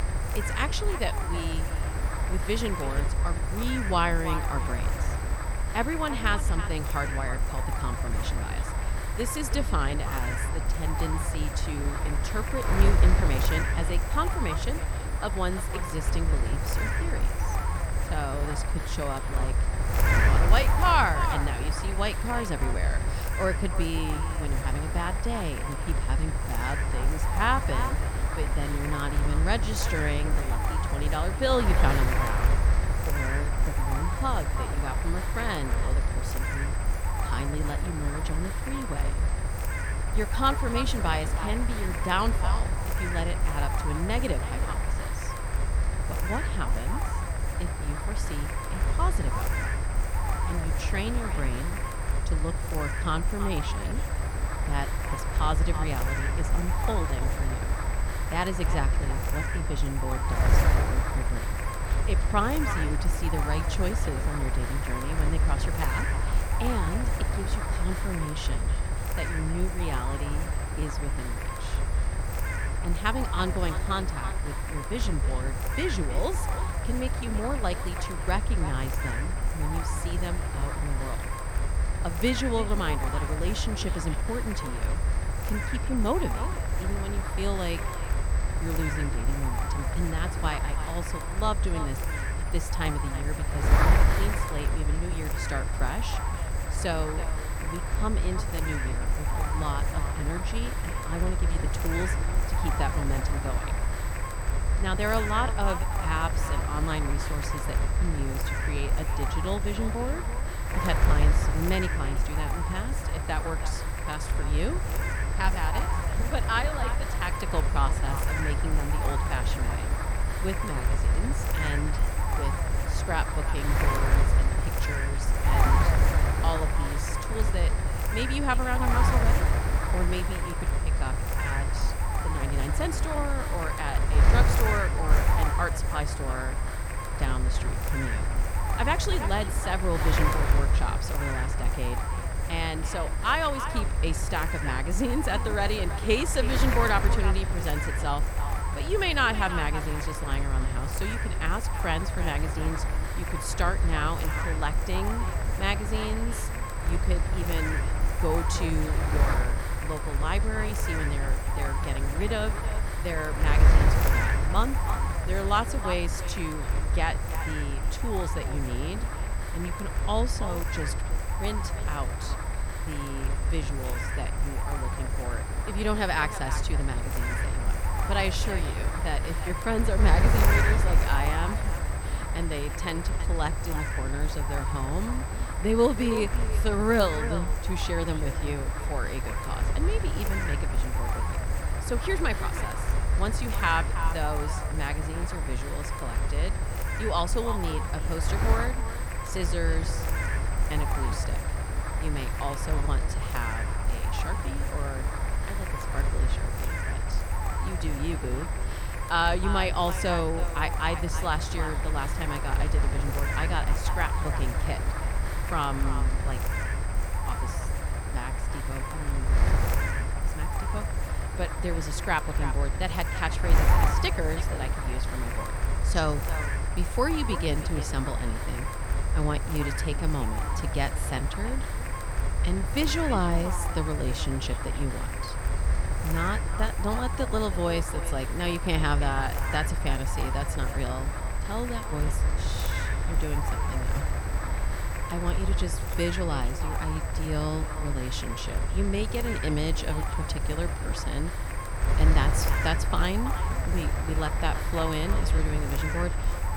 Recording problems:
echo of what is said; noticeable; throughout; 330 ms later, 10 dB below the speech
wind noise on the microphone; heavy; 2 dB below the speech
high-pitched whine; noticeable; throughout; 8 kHz, 10 dB below the speech

